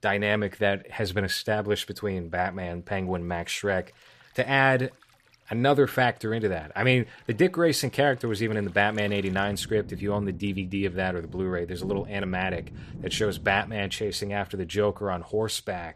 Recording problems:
rain or running water; noticeable; throughout; 15 dB below the speech

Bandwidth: 14.5 kHz